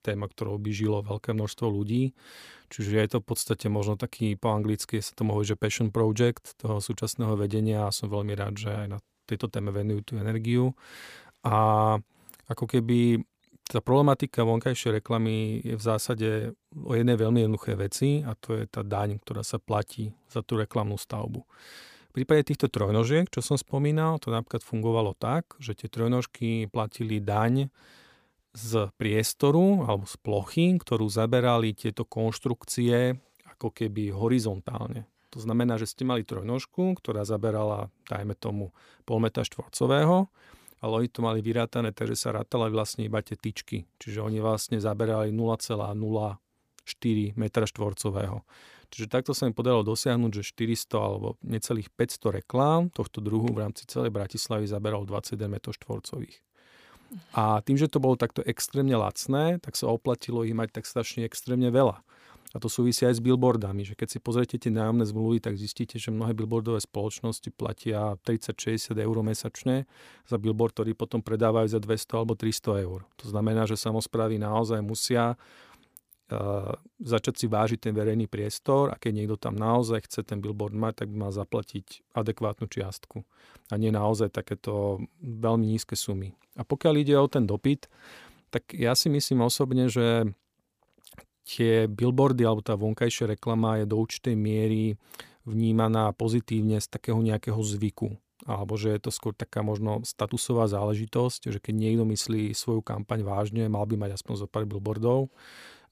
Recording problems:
none

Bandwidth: 15 kHz